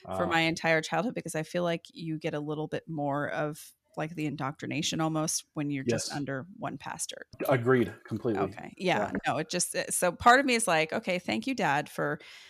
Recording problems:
none

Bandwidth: 14.5 kHz